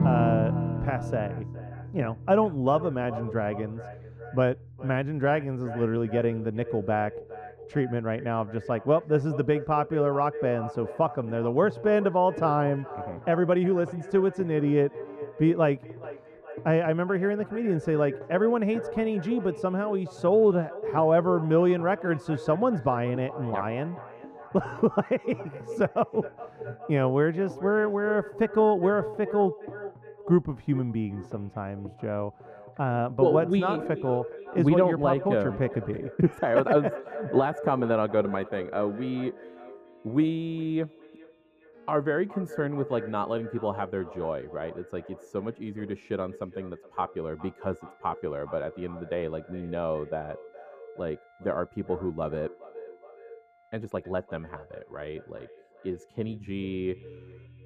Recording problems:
muffled; very; fading above 1.5 kHz
echo of what is said; noticeable; throughout; 410 ms later, 15 dB below the speech
background music; noticeable; throughout; 15 dB below the speech
uneven, jittery; strongly; from 13 to 54 s

